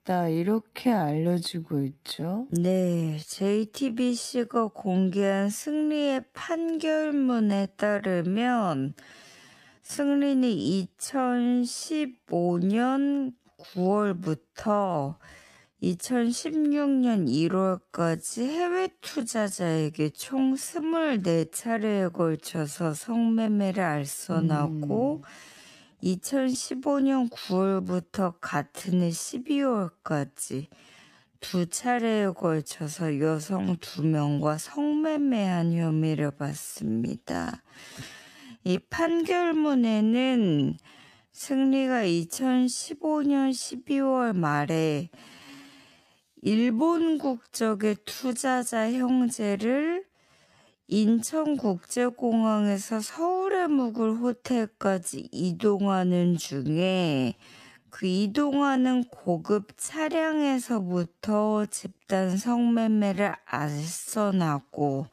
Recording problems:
wrong speed, natural pitch; too slow; 0.5 times normal speed

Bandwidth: 14.5 kHz